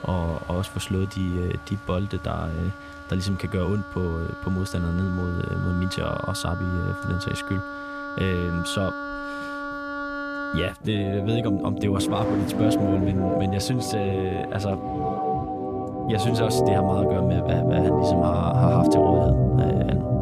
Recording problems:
background music; very loud; throughout; 2 dB above the speech
traffic noise; noticeable; throughout; 20 dB below the speech

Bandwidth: 14.5 kHz